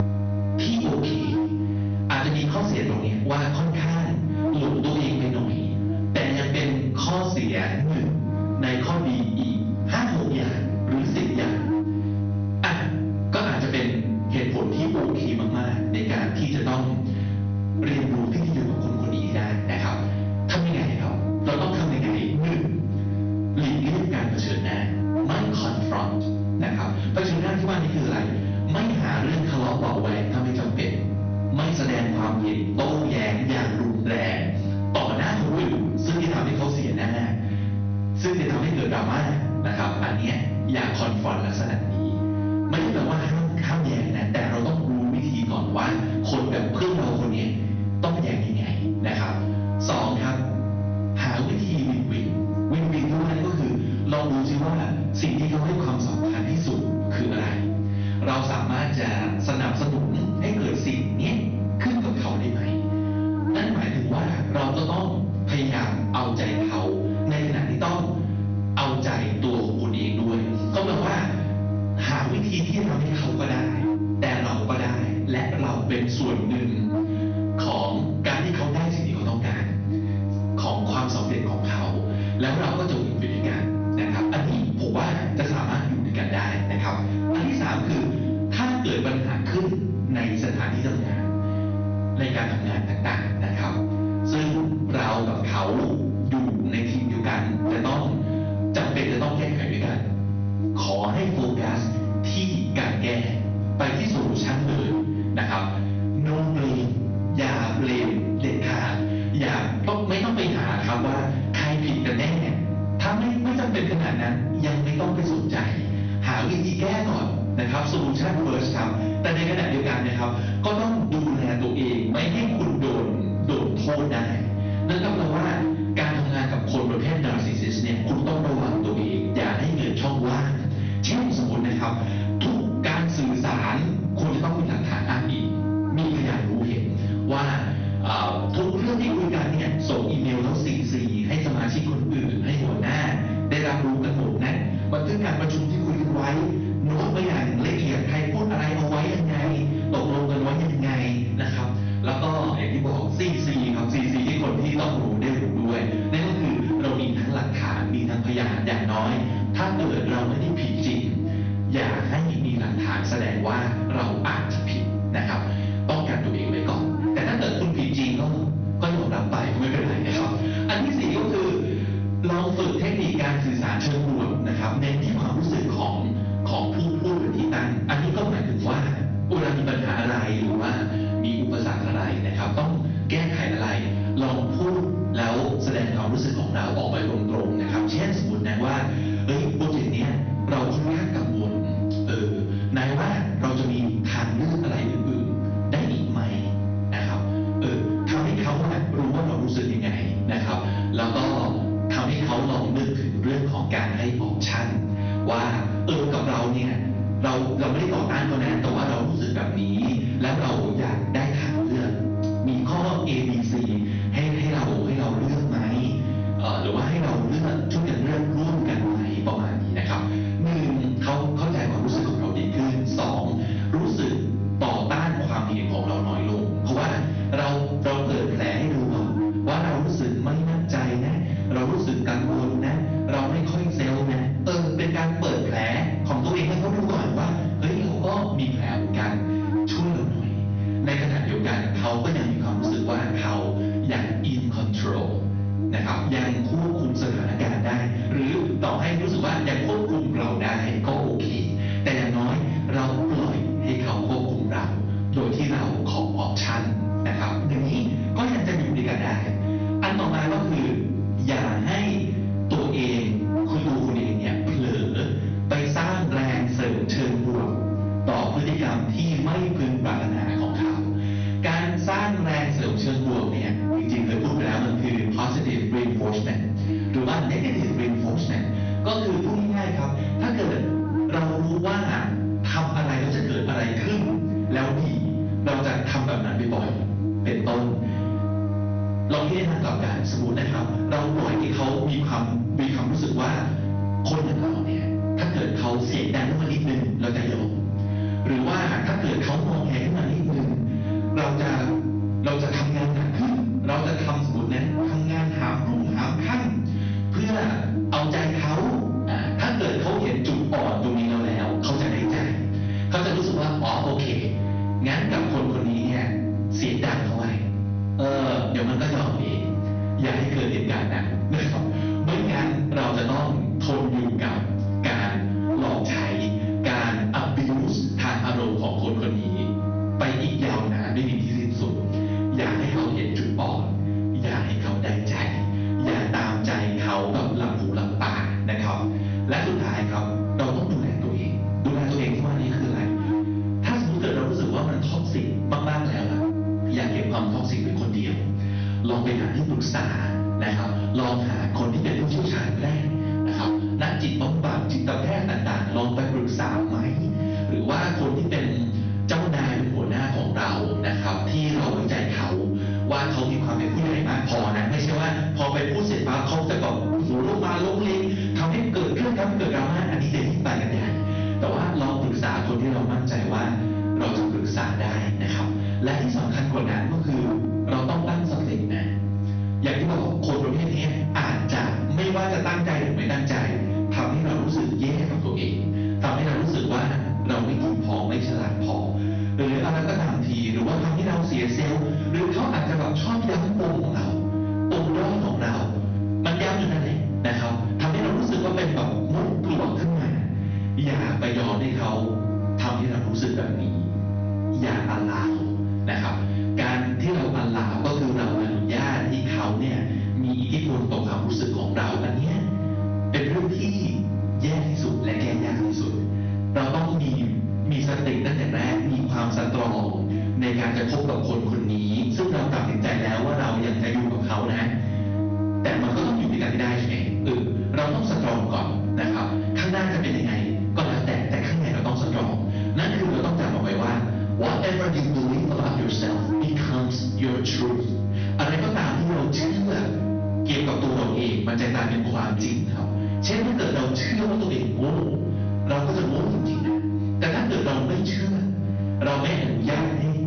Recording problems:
off-mic speech; far
room echo; noticeable; dies away in 0.6 s
high frequencies cut off; noticeable; nothing above 6 kHz
distortion; slight; 12% of the sound clipped
squashed, flat; somewhat
electrical hum; loud; throughout; 50 Hz, 7 dB below the speech

